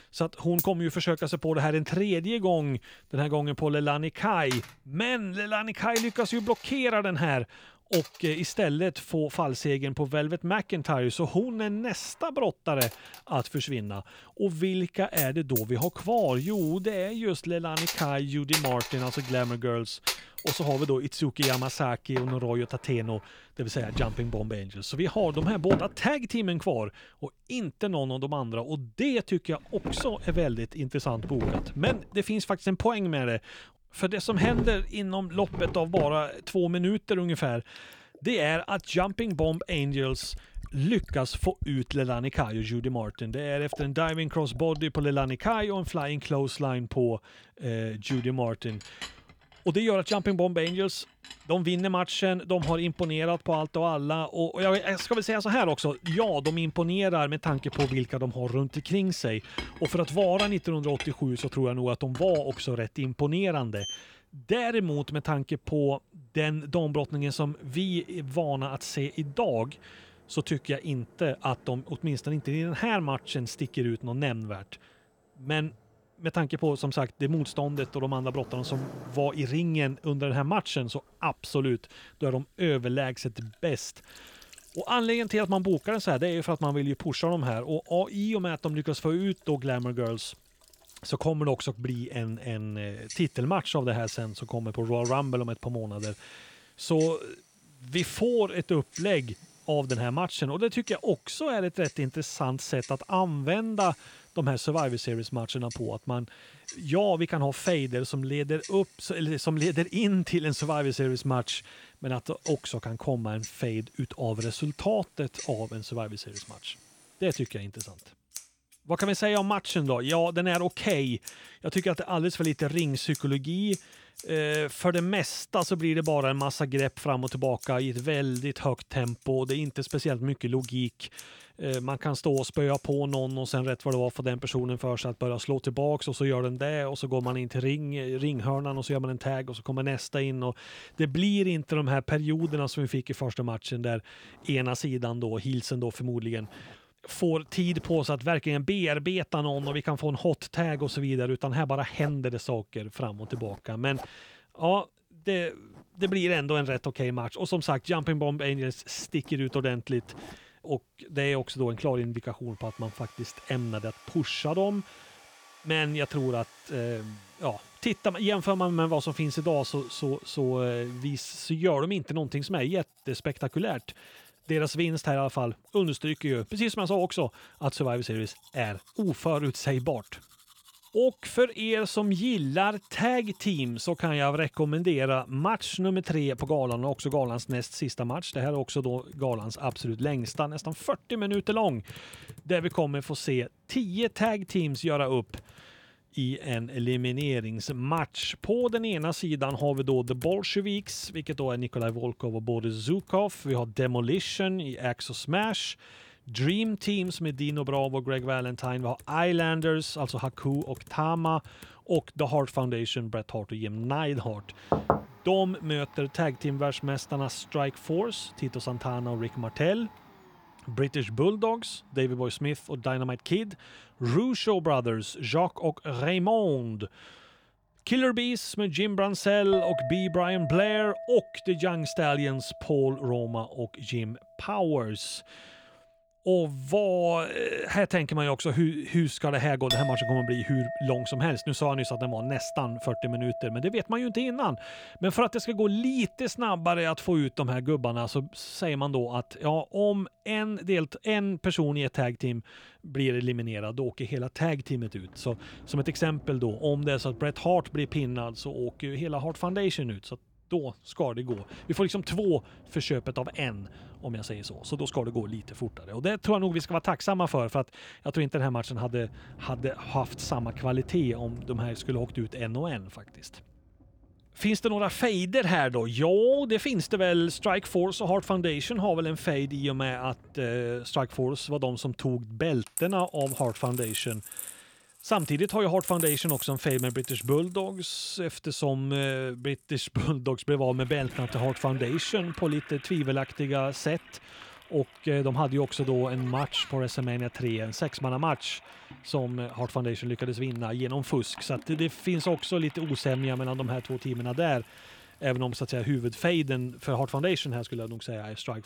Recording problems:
household noises; noticeable; throughout; 10 dB below the speech
door banging; loud; at 3:35; peak 2 dB above the speech

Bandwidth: 18.5 kHz